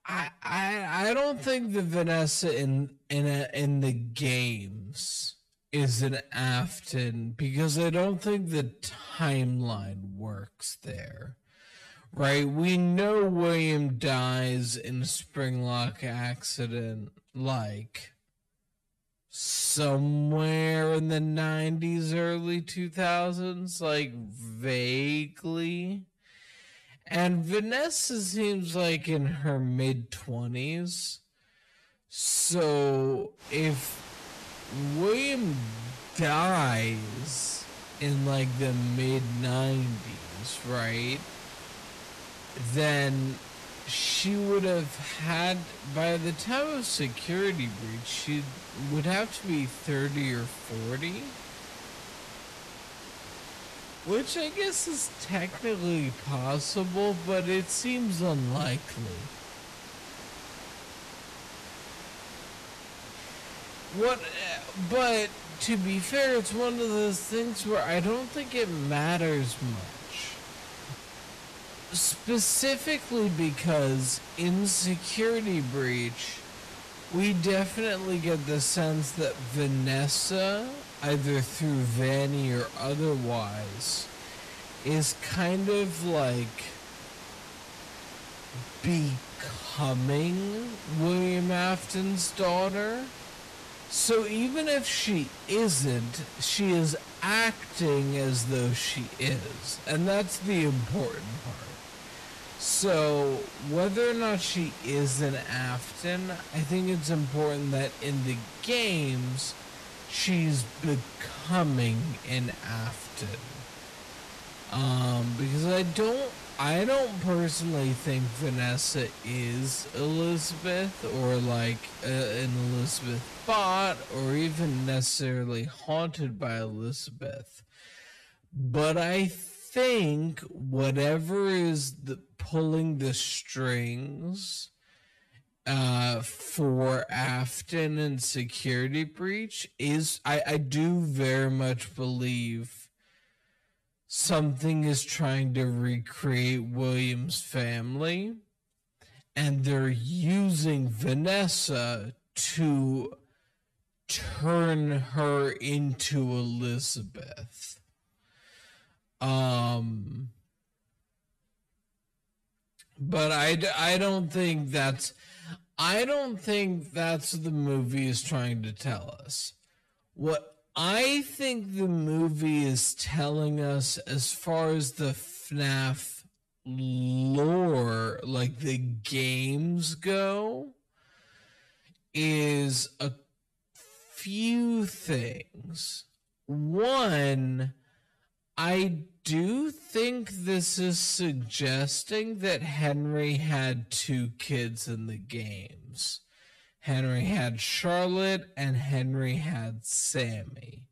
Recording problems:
wrong speed, natural pitch; too slow; 0.5 times normal speed
distortion; slight; 10 dB below the speech
hiss; noticeable; from 33 s to 2:05; 15 dB below the speech
uneven, jittery; strongly; from 21 s to 2:57

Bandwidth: 13.5 kHz